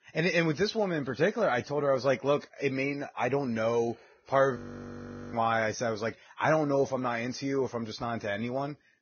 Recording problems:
garbled, watery; badly; nothing above 6.5 kHz
audio freezing; at 4.5 s for 1 s

